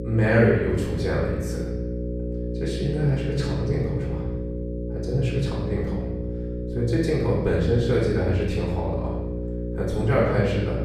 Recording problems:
off-mic speech; far
room echo; noticeable; dies away in 1 s
electrical hum; loud; throughout; 60 Hz, 8 dB below the speech

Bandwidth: 14 kHz